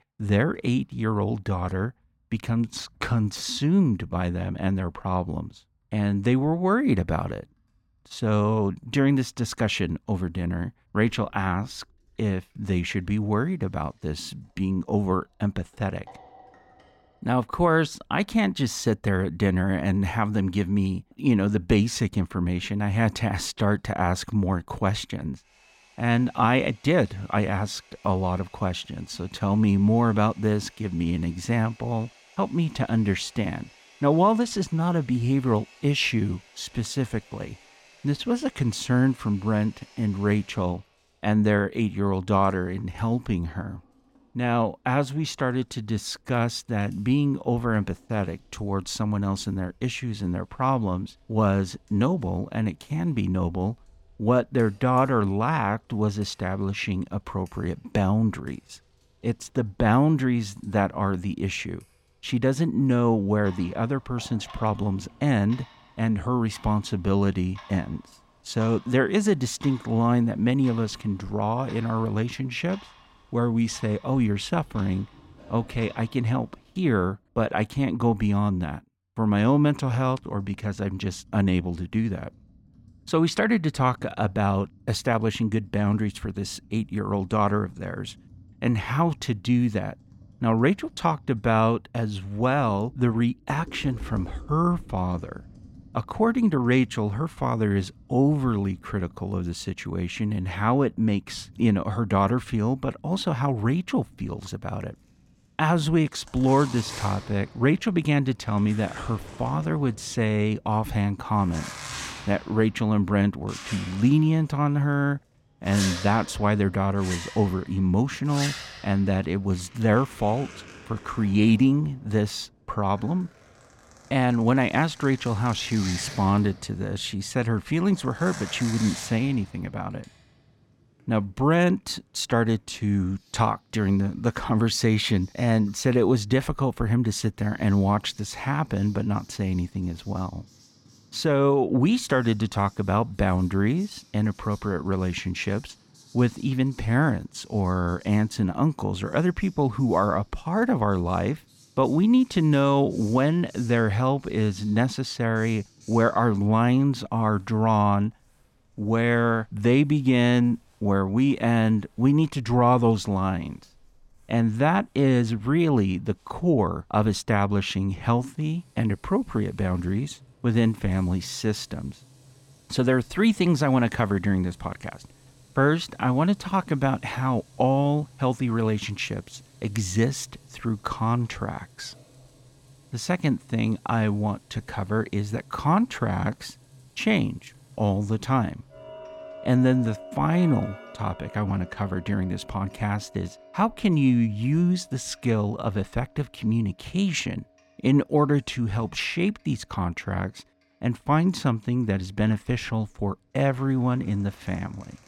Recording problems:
household noises; faint; throughout; 20 dB below the speech

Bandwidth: 16.5 kHz